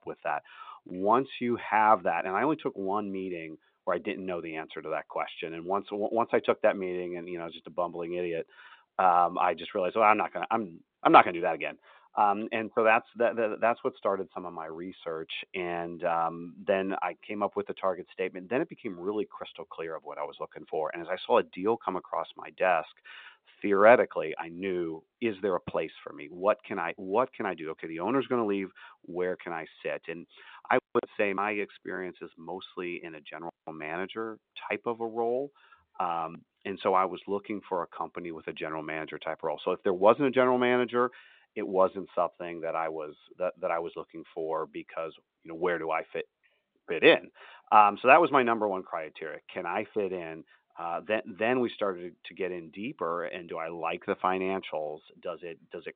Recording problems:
phone-call audio; nothing above 3.5 kHz

